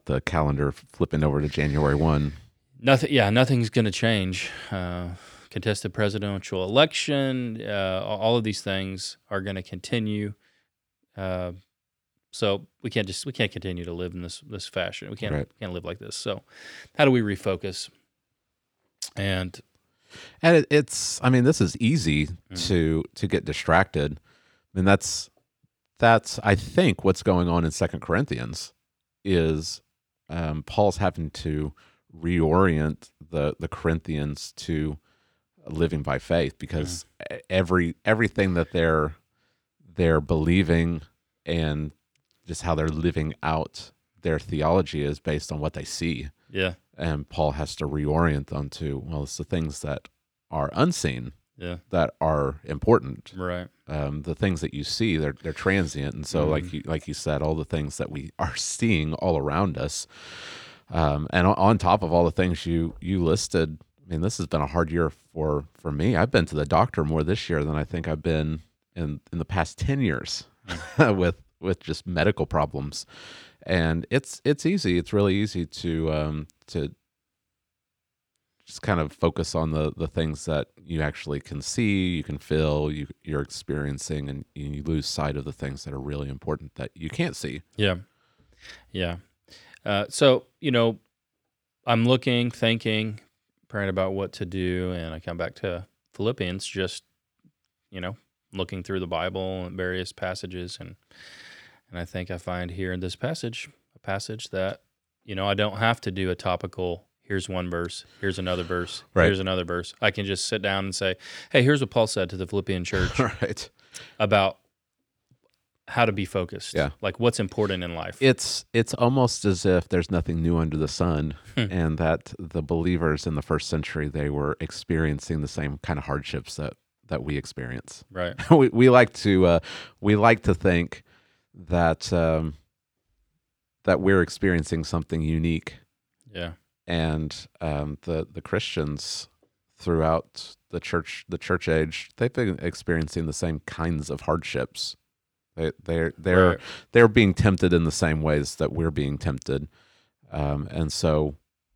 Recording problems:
none

